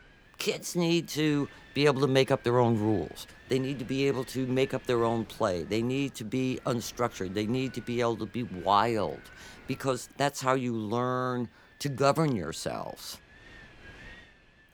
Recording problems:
wind noise on the microphone; occasional gusts; 20 dB below the speech

